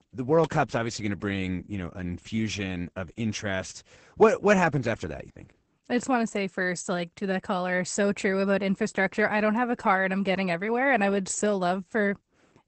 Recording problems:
garbled, watery; badly; nothing above 8 kHz

